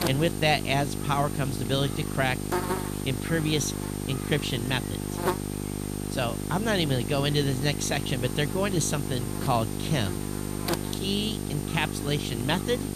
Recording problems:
electrical hum; loud; throughout; 50 Hz, 6 dB below the speech

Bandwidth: 14.5 kHz